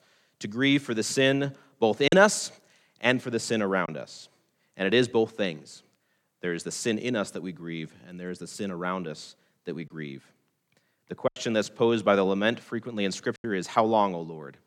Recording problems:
choppy; occasionally; 2% of the speech affected

